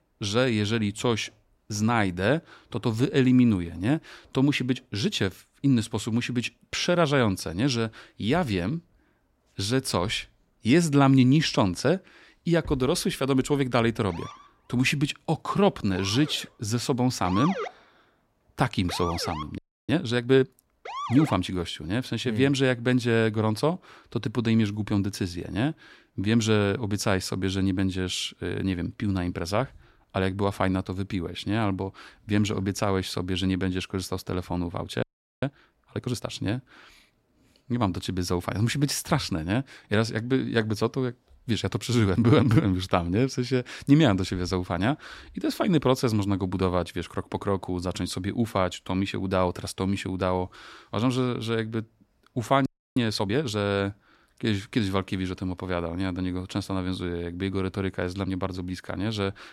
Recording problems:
siren; noticeable; from 14 to 21 s; peak 4 dB below the speech
audio freezing; at 20 s, at 35 s and at 53 s

